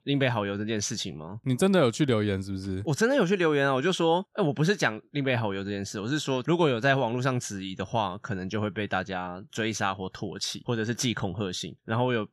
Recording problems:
none

